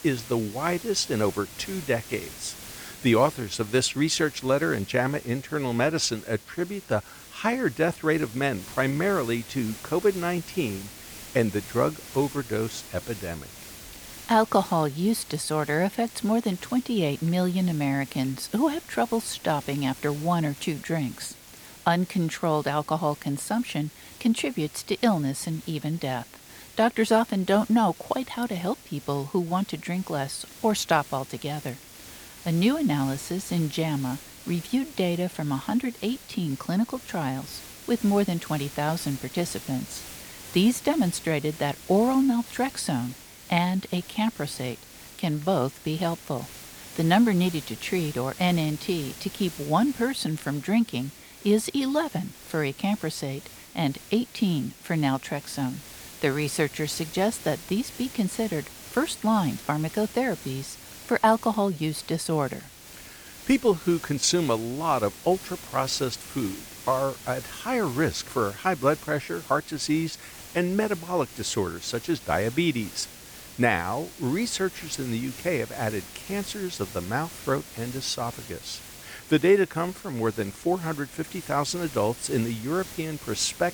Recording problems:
hiss; noticeable; throughout; 15 dB below the speech

